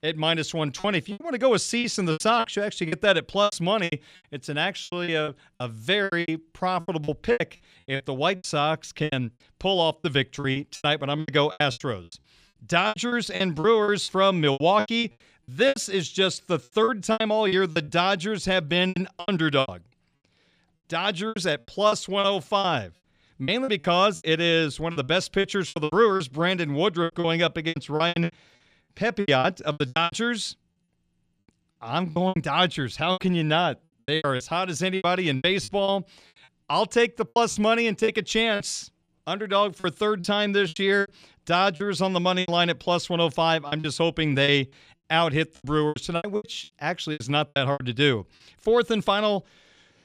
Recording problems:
choppy; very; 15% of the speech affected

